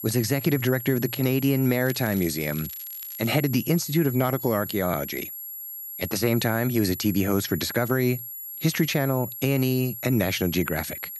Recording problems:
high-pitched whine; loud; throughout; 11.5 kHz, 9 dB below the speech
crackling; faint; from 2 to 3.5 s; 20 dB below the speech

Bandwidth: 14.5 kHz